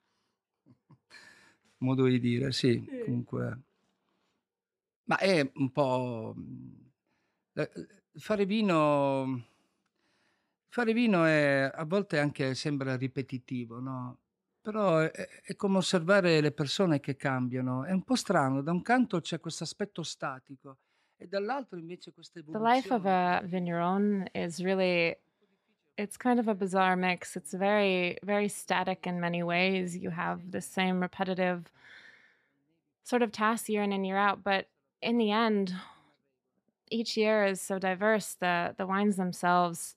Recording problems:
none

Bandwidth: 14 kHz